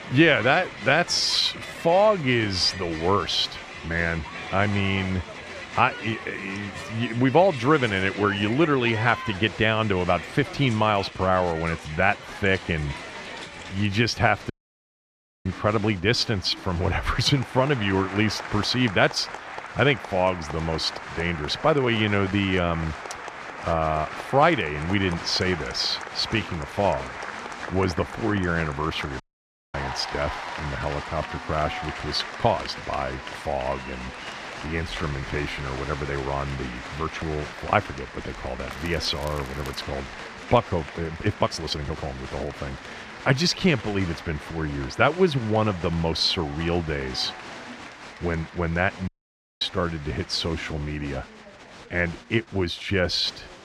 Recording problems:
crowd noise; noticeable; throughout; 10 dB below the speech
voice in the background; faint; throughout; 25 dB below the speech
crackling; faint; from 39 to 40 s; 25 dB below the speech
uneven, jittery; strongly; from 1 to 53 s
audio cutting out; at 15 s for 1 s, at 29 s for 0.5 s and at 49 s for 0.5 s

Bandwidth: 14.5 kHz